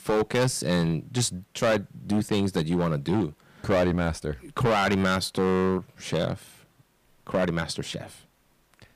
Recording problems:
distortion; heavy; 8% of the sound clipped

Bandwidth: 15 kHz